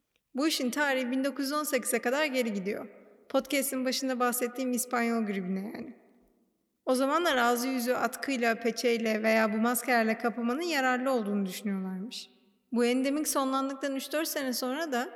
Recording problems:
echo of what is said; noticeable; throughout; 120 ms later, 15 dB below the speech

